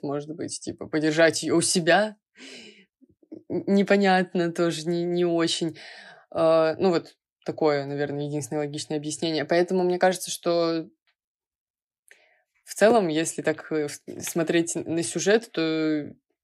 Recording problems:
none

